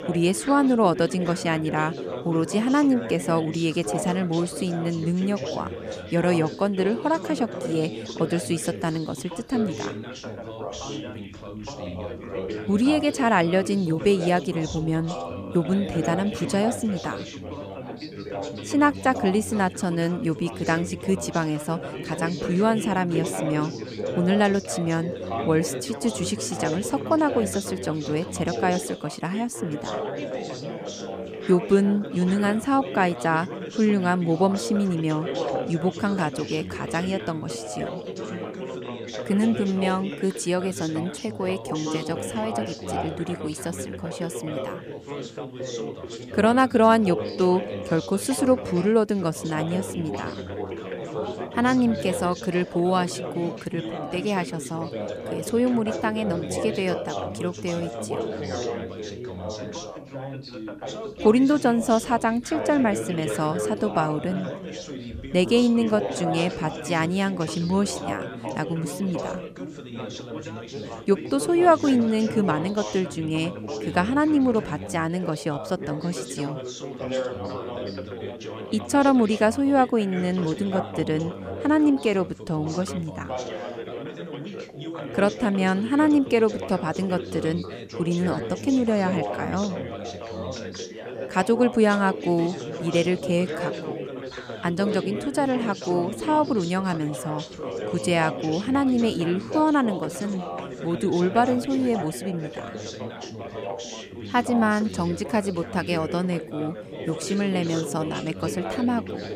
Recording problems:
background chatter; loud; throughout; 4 voices, 9 dB below the speech

